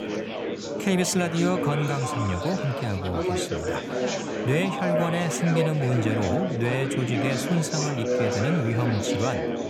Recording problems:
chatter from many people; loud; throughout; 2 dB below the speech

